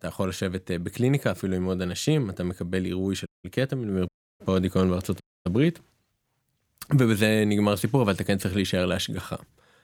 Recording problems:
audio cutting out; at 3.5 s, at 4 s and at 5 s

